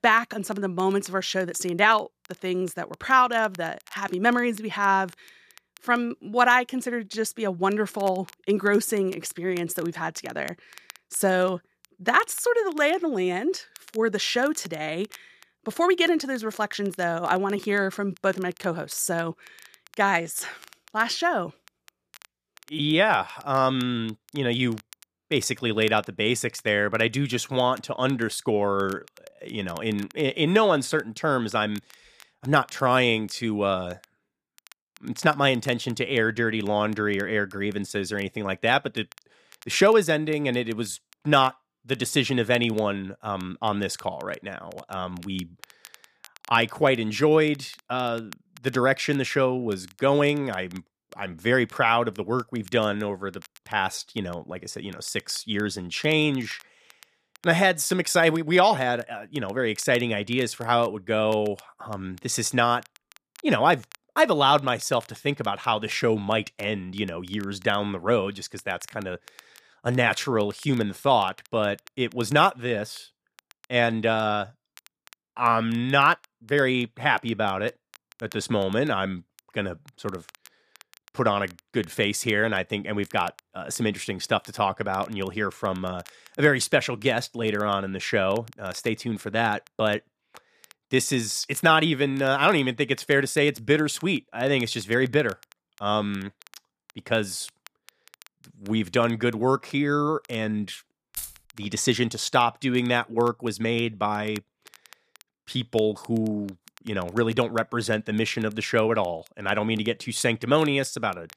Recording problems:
crackle, like an old record; faint; 25 dB below the speech
jangling keys; faint; at 1:41; peak 10 dB below the speech

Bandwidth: 14.5 kHz